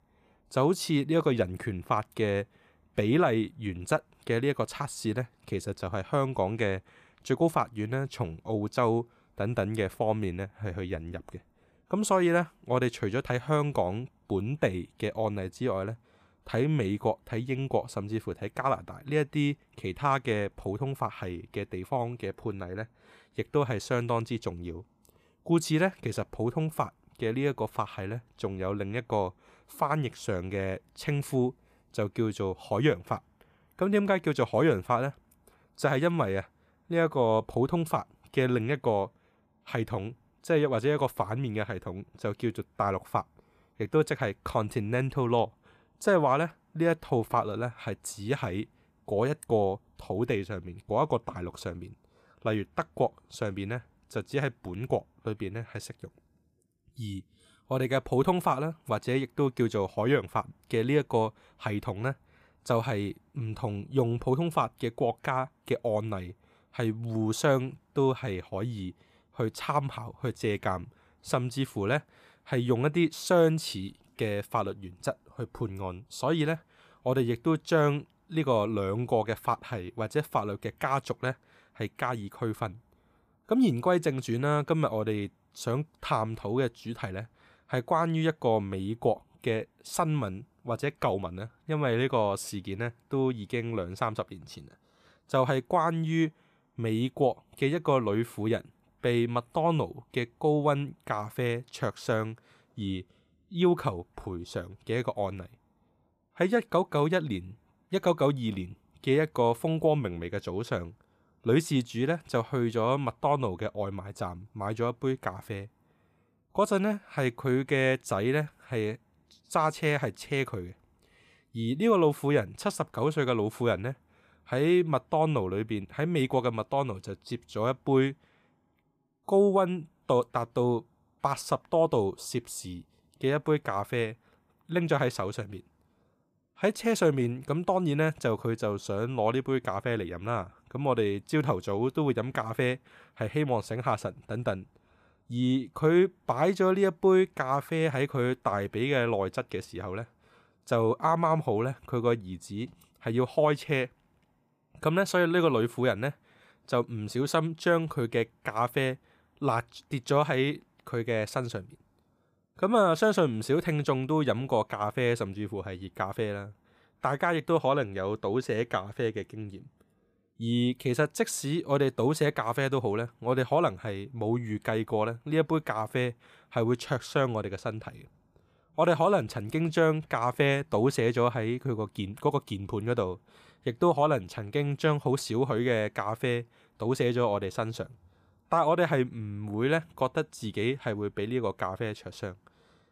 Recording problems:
none

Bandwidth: 14.5 kHz